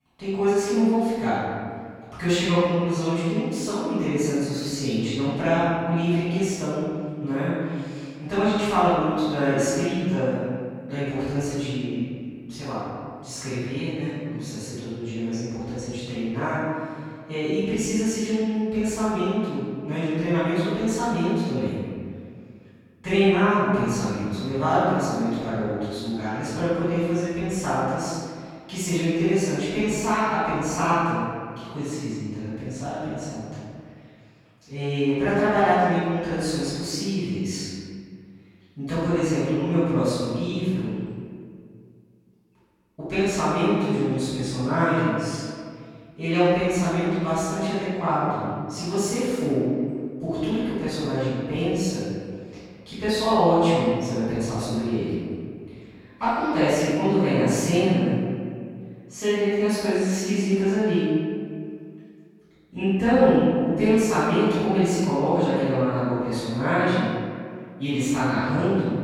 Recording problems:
room echo; strong; dies away in 2 s
off-mic speech; far

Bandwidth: 17 kHz